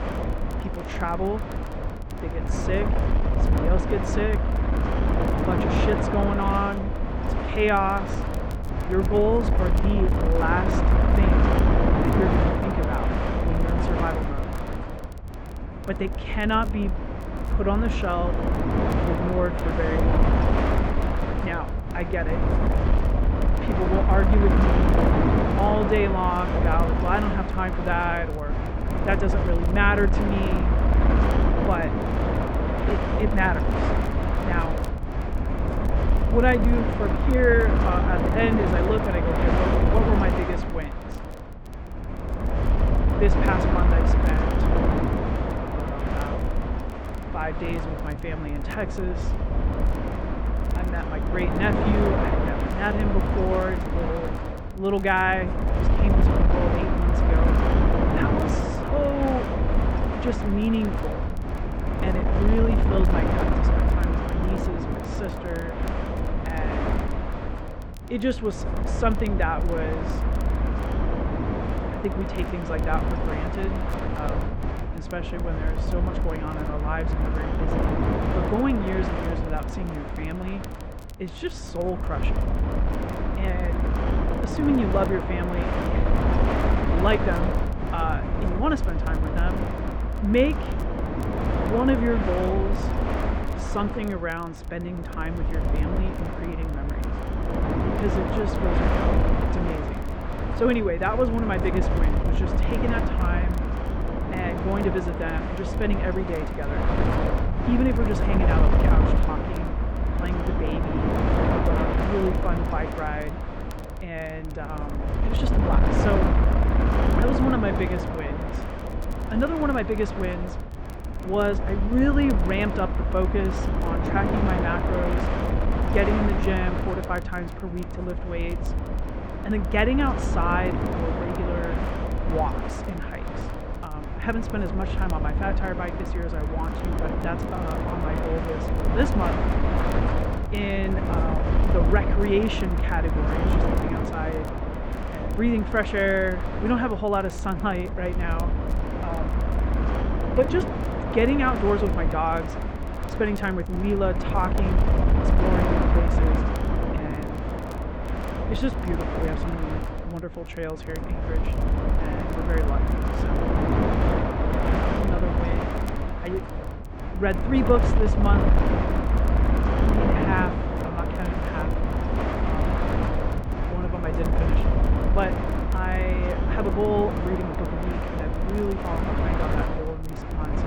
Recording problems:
muffled; very; fading above 2.5 kHz
wind noise on the microphone; heavy; 2 dB below the speech
crackle, like an old record; faint; 25 dB below the speech

